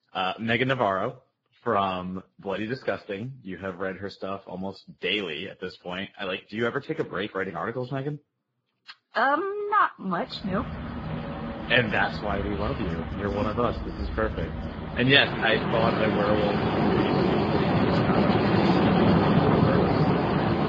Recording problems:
garbled, watery; badly
rain or running water; very loud; from 10 s on; 3 dB above the speech

